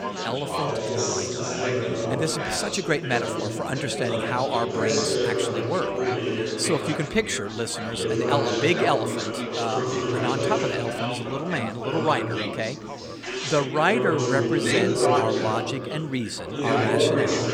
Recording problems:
chatter from many people; very loud; throughout; 1 dB above the speech

